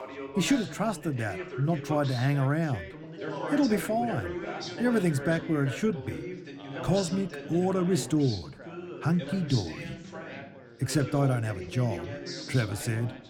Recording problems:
background chatter; loud; throughout; 3 voices, 10 dB below the speech

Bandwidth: 18.5 kHz